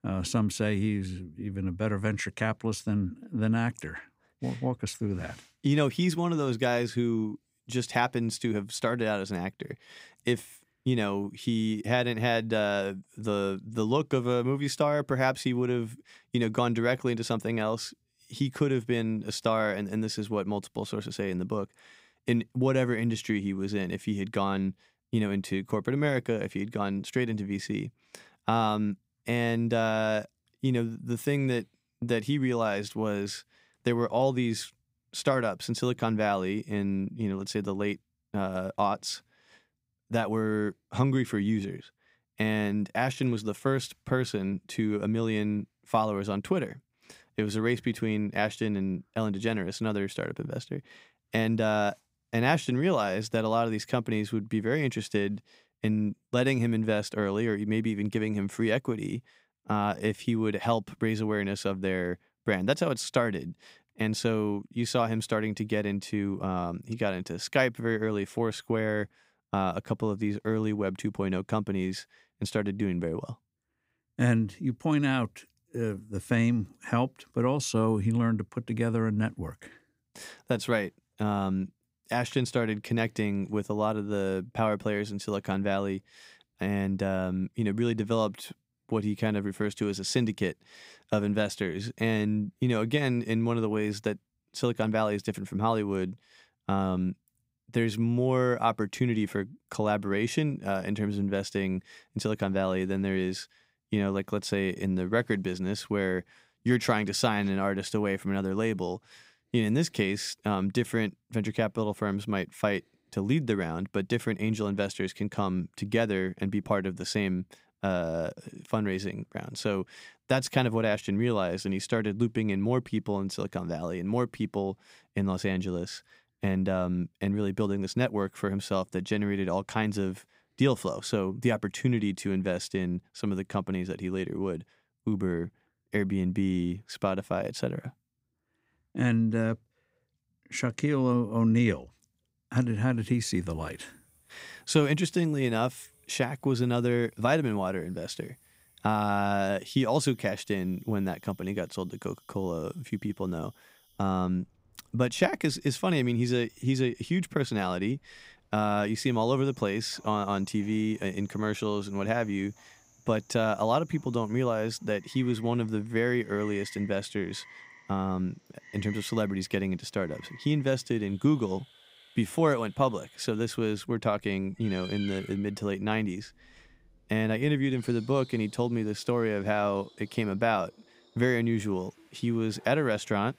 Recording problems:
animal sounds; faint; from 2:23 on; 25 dB below the speech

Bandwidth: 15.5 kHz